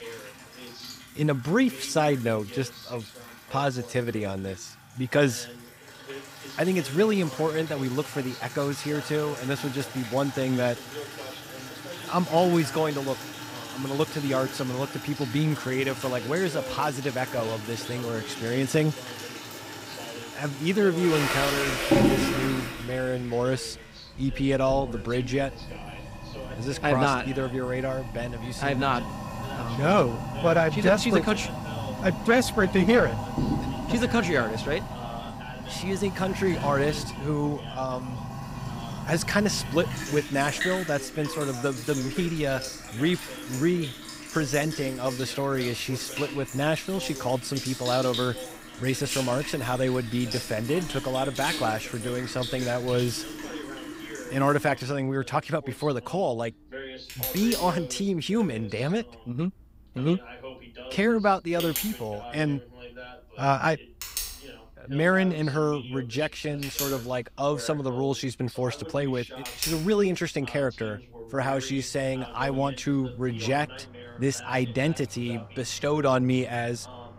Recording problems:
household noises; loud; throughout; 7 dB below the speech
voice in the background; noticeable; throughout; 15 dB below the speech

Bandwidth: 15.5 kHz